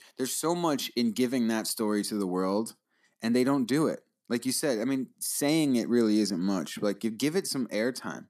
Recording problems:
none

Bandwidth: 14.5 kHz